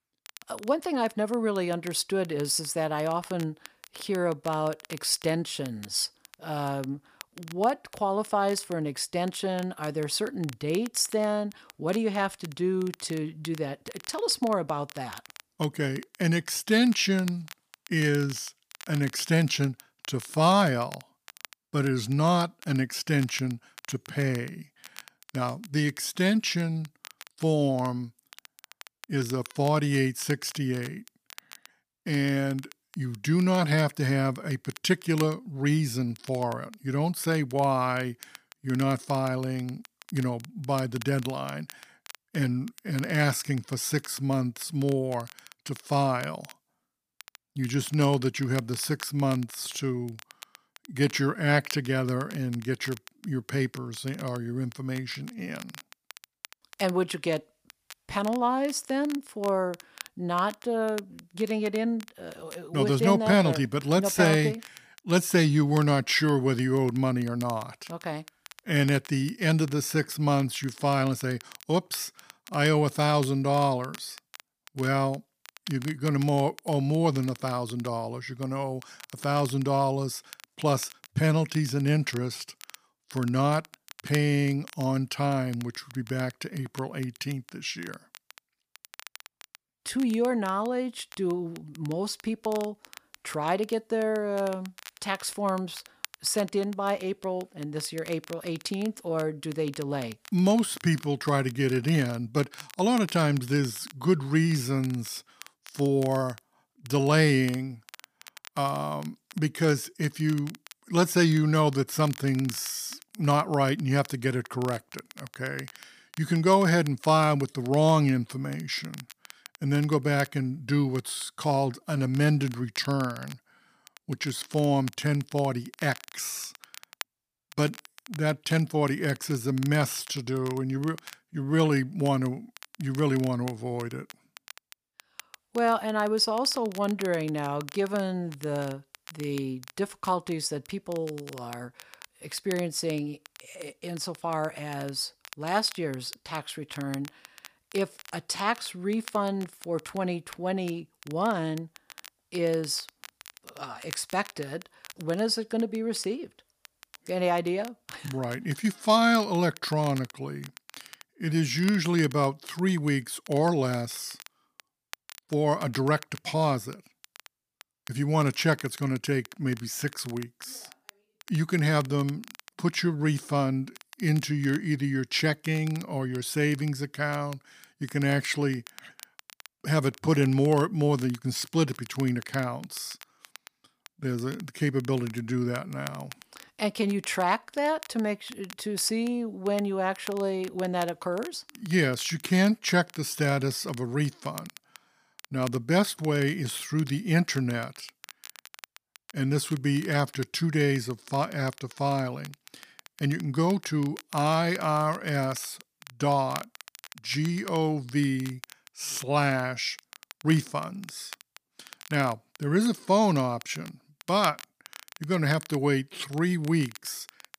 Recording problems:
crackle, like an old record; faint; 20 dB below the speech

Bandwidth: 15 kHz